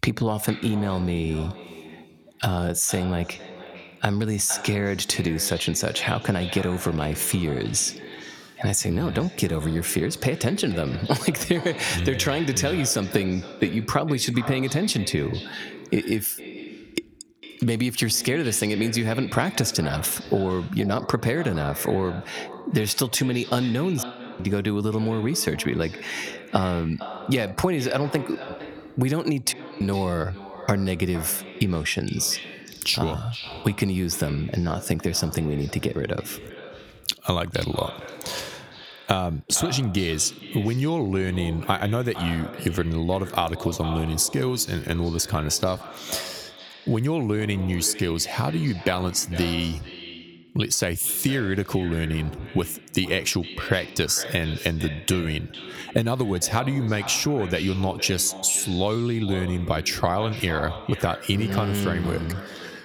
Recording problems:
echo of what is said; noticeable; throughout; 460 ms later, 15 dB below the speech
squashed, flat; somewhat
audio cutting out; at 24 s and at 30 s

